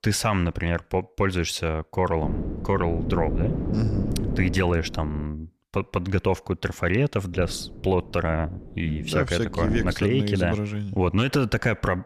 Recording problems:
wind noise on the microphone; occasional gusts; from 2 to 5 s and from 7.5 to 10 s; 10 dB below the speech

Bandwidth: 14.5 kHz